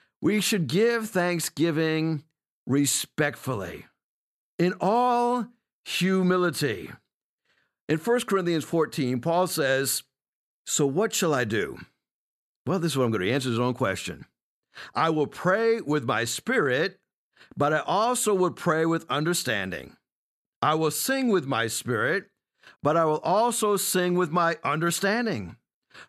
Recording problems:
none

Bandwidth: 13.5 kHz